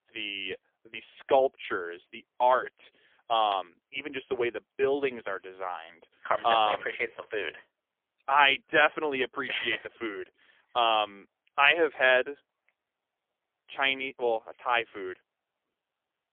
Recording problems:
phone-call audio; poor line; nothing above 3.5 kHz

